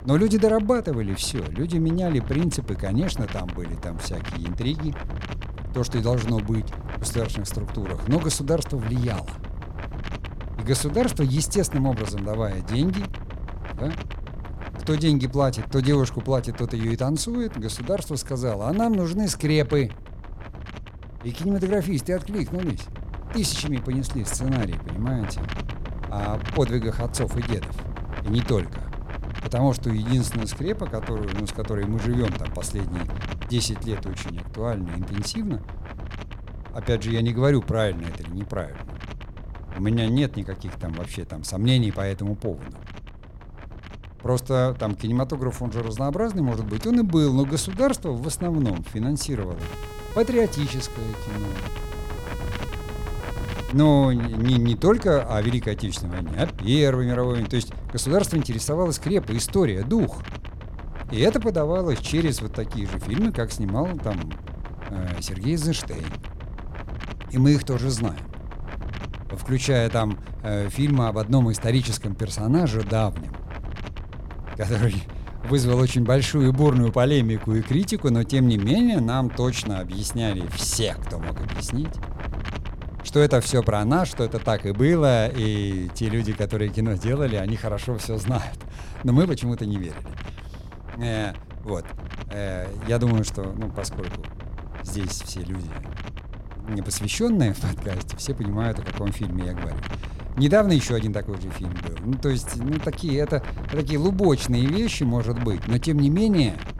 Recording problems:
wind noise on the microphone; occasional gusts; 15 dB below the speech
siren; faint; from 50 to 54 s; peak 15 dB below the speech

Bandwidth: 17.5 kHz